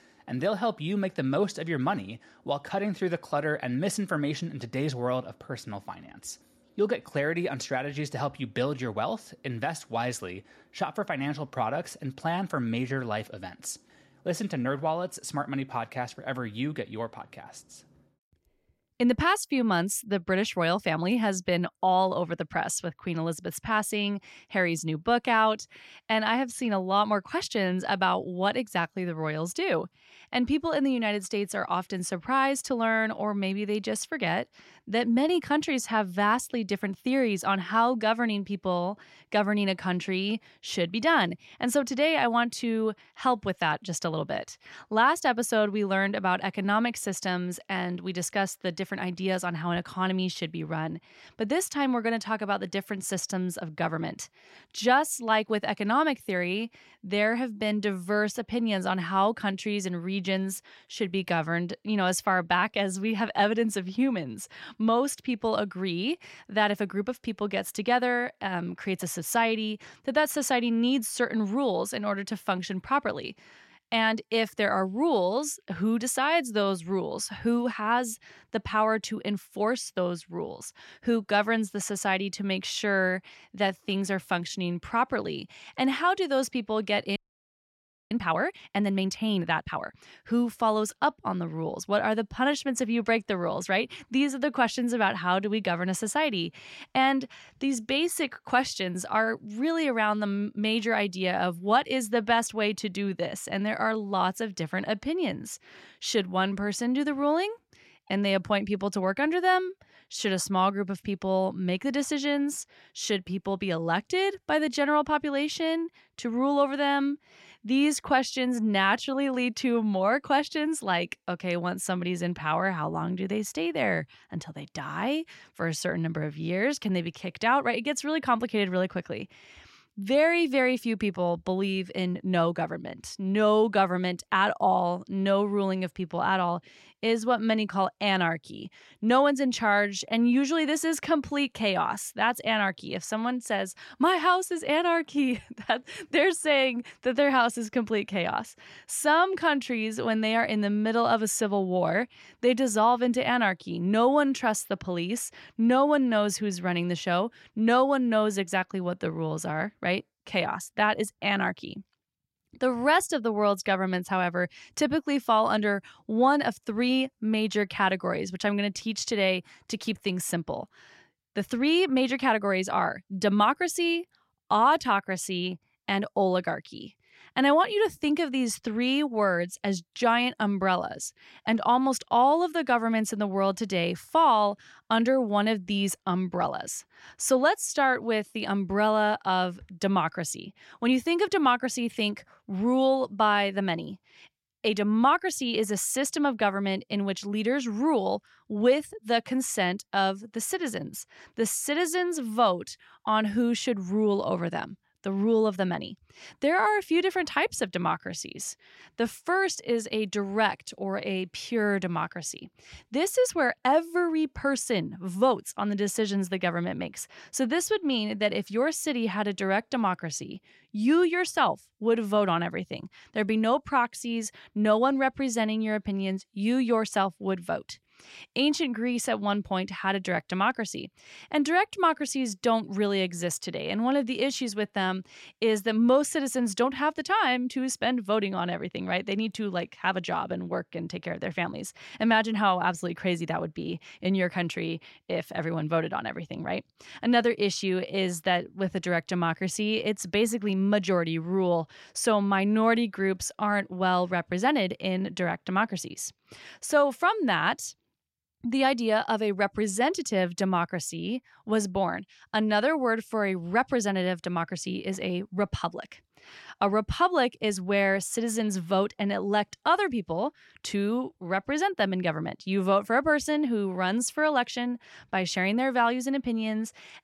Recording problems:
audio freezing; at 1:27 for 1 s

